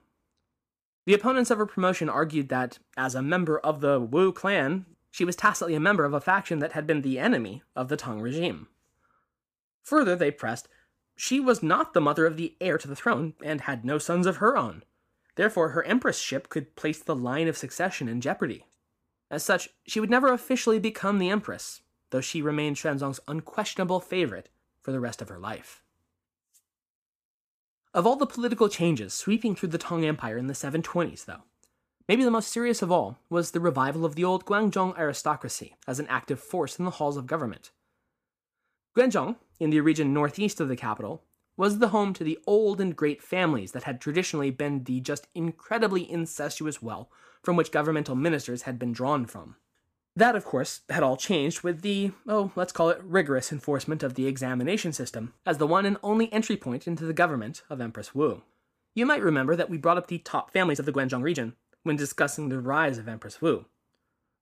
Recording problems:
uneven, jittery; strongly; from 11 s to 1:03

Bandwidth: 15 kHz